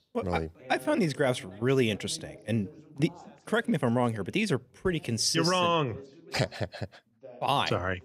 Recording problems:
background chatter; faint; throughout; 2 voices, 20 dB below the speech

